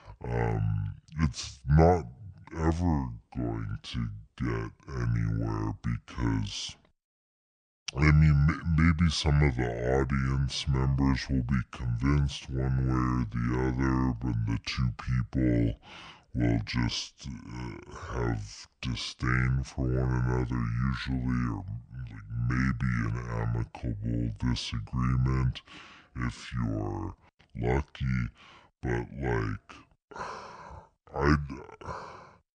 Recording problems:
wrong speed and pitch; too slow and too low; 0.6 times normal speed

